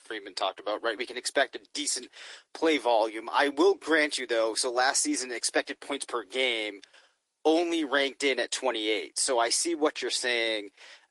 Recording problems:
thin; somewhat; fading below 300 Hz
garbled, watery; slightly; nothing above 11 kHz

